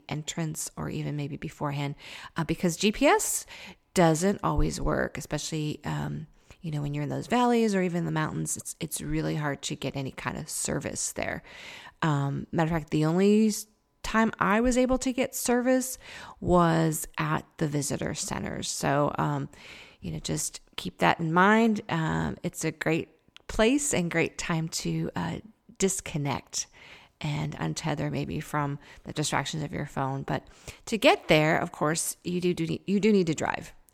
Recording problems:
none

